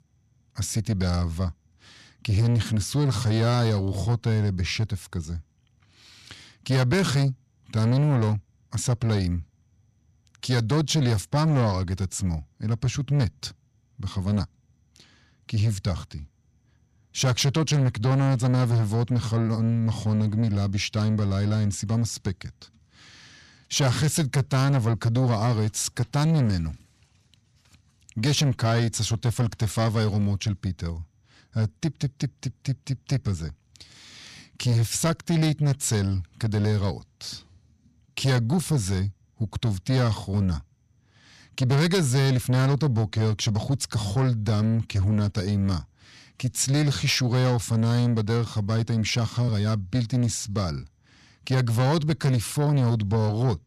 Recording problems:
distortion; slight; 10 dB below the speech

